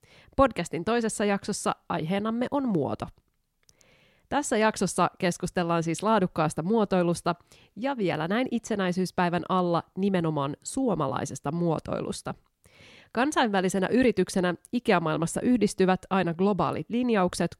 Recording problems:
none

